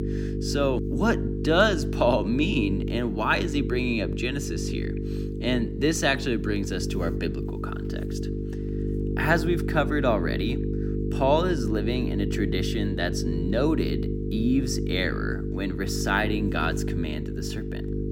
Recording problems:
electrical hum; loud; throughout; 50 Hz, 8 dB below the speech

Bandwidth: 16 kHz